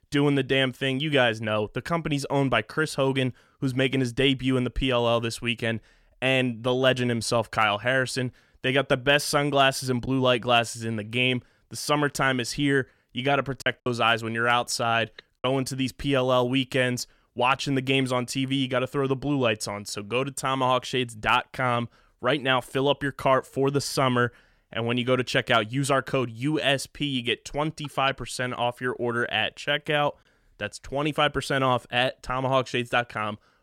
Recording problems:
choppy; occasionally; from 10 to 14 s and at 15 s; 2% of the speech affected

